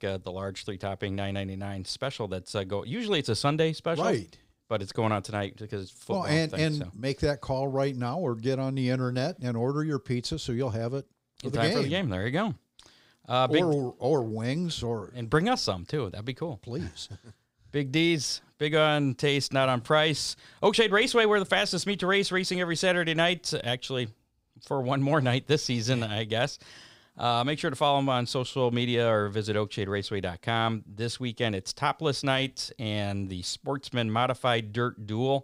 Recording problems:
none

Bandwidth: 15.5 kHz